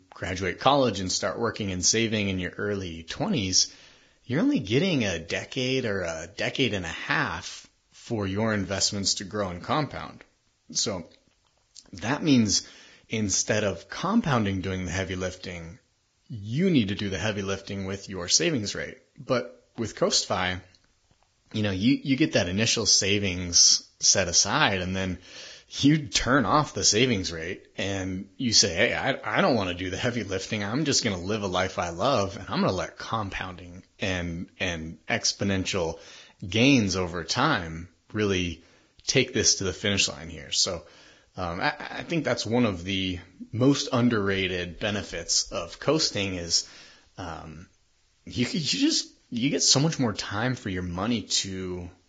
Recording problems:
garbled, watery; badly

